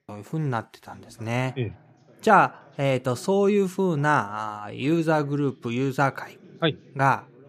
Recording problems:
voice in the background; faint; throughout; 25 dB below the speech

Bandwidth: 15 kHz